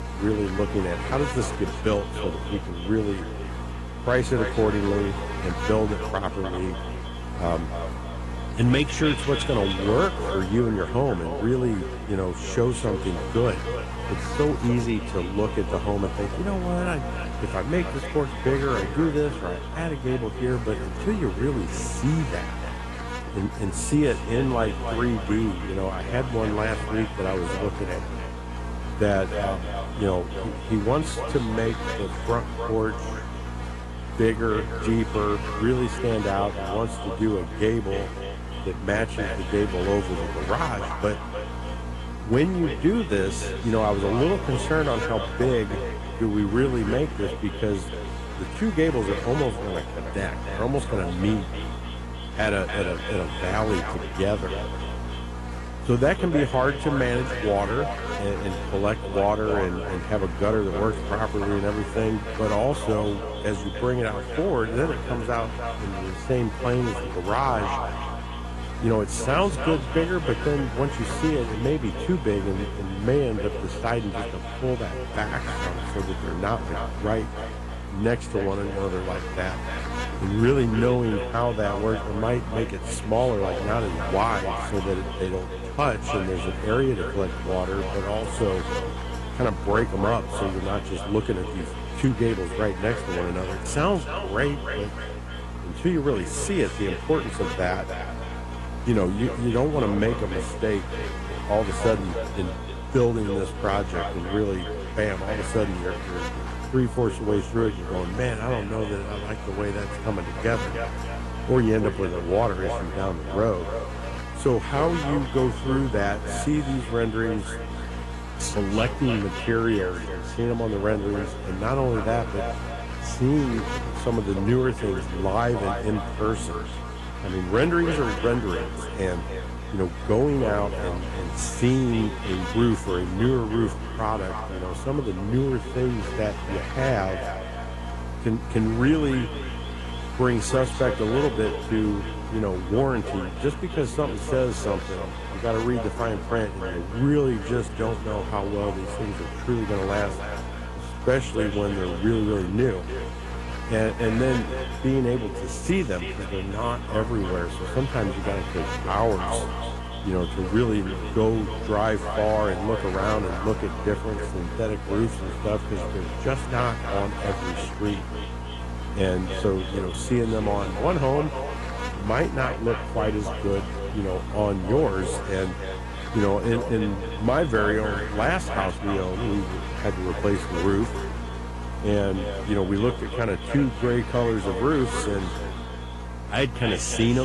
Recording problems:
echo of what is said; strong; throughout; 300 ms later, 10 dB below the speech
garbled, watery; slightly
electrical hum; loud; throughout; 60 Hz, 9 dB below the speech
abrupt cut into speech; at the end

